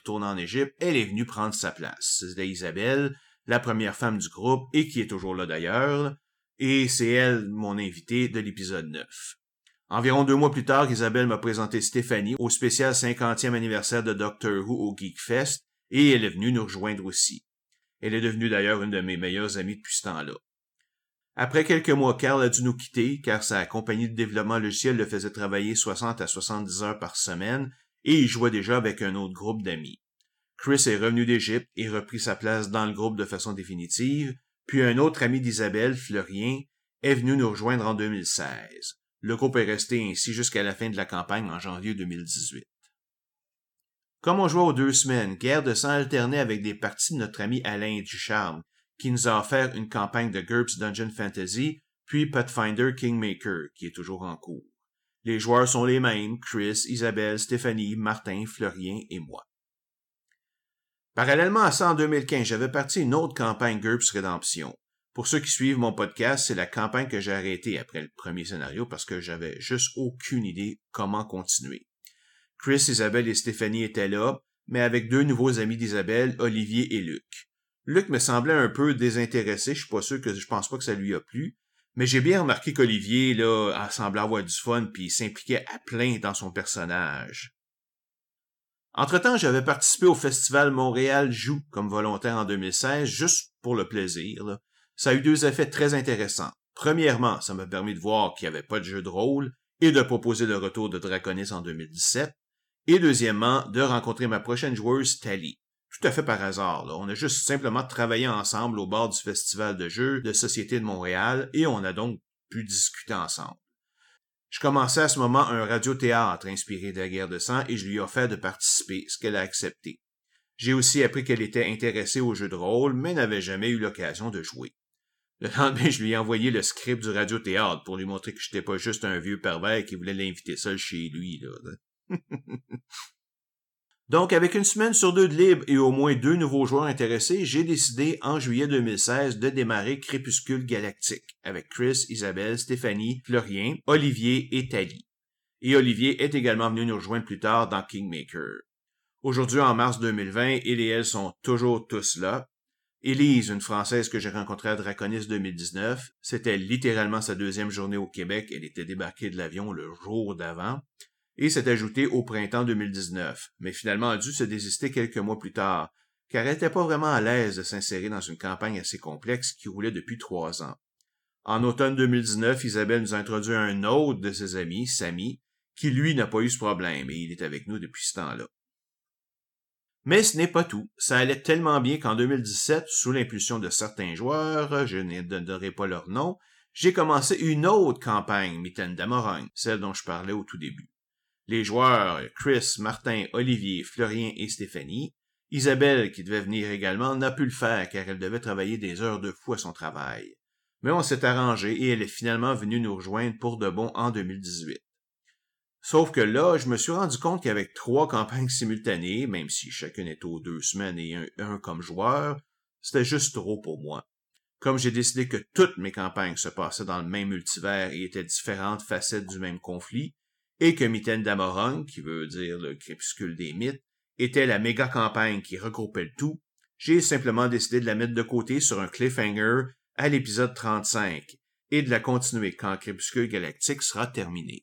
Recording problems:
none

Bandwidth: 17.5 kHz